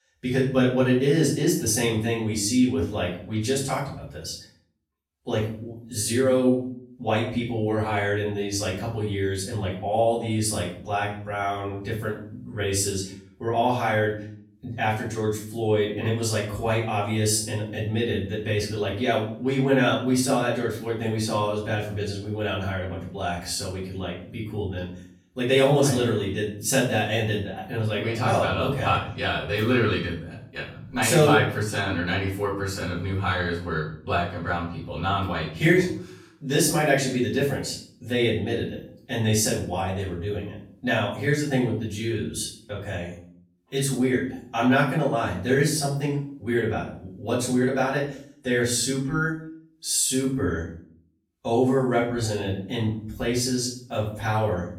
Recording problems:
off-mic speech; far
room echo; noticeable; dies away in 0.5 s

